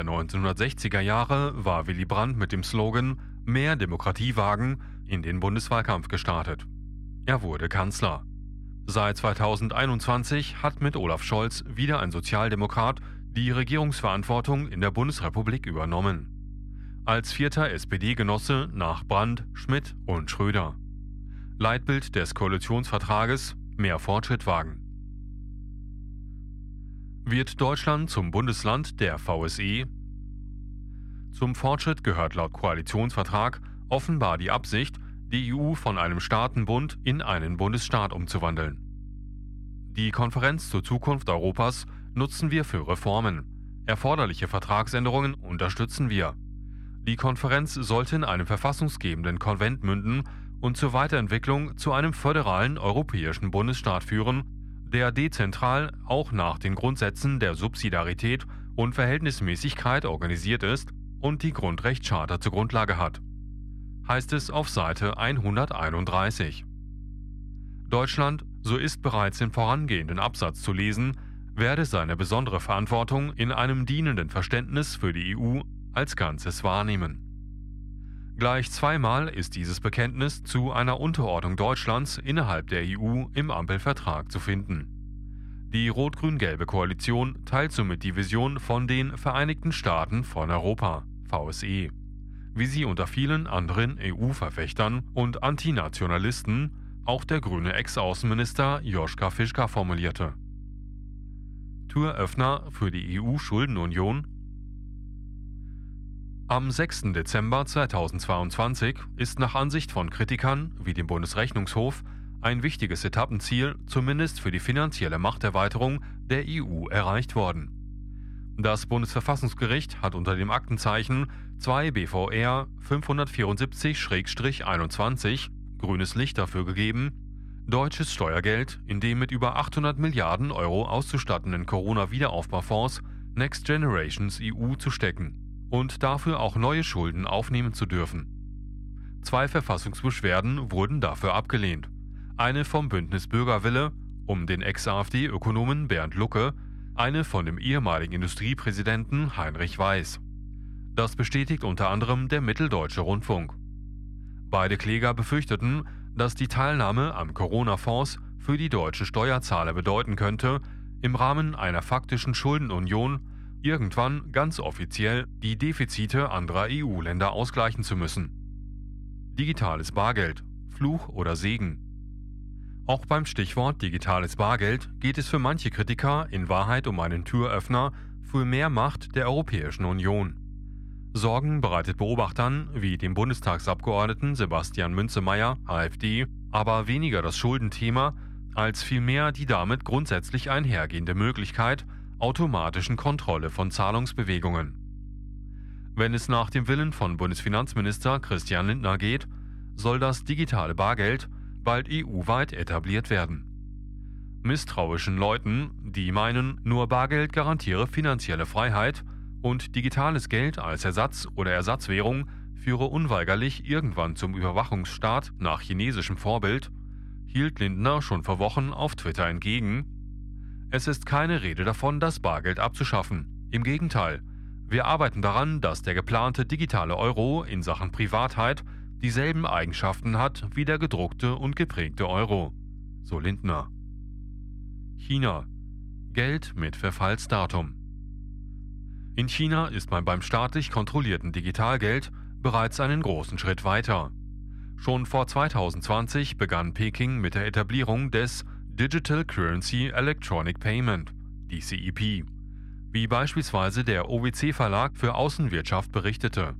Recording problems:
muffled; slightly; fading above 3.5 kHz
electrical hum; faint; throughout; 50 Hz, 30 dB below the speech
abrupt cut into speech; at the start

